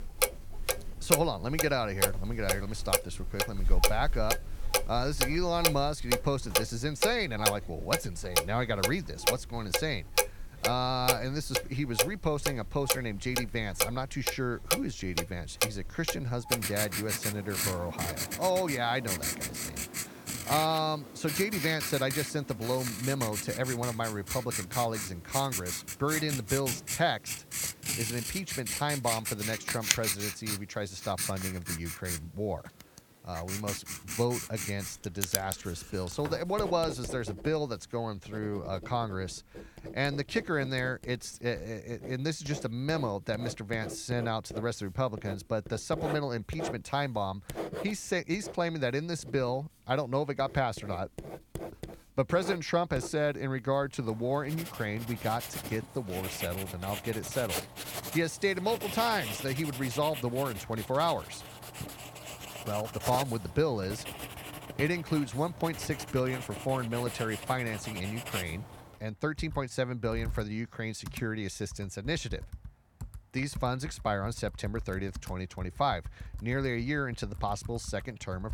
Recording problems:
household noises; loud; throughout; 2 dB below the speech

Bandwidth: 18 kHz